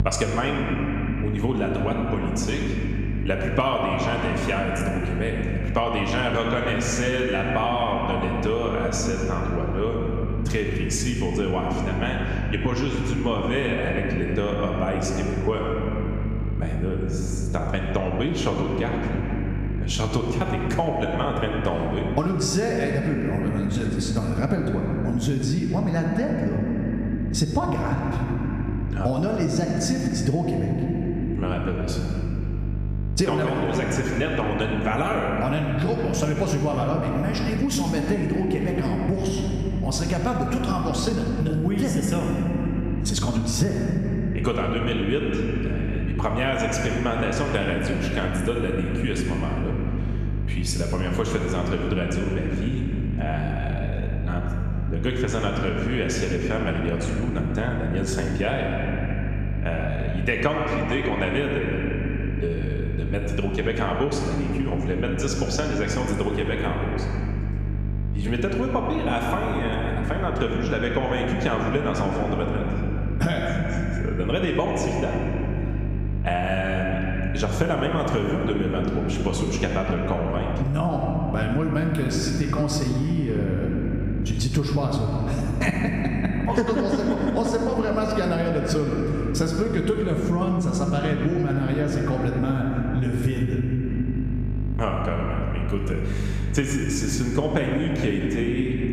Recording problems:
room echo; noticeable; dies away in 2.6 s
off-mic speech; somewhat distant
squashed, flat; somewhat
electrical hum; noticeable; throughout; 50 Hz, 20 dB below the speech

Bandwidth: 14.5 kHz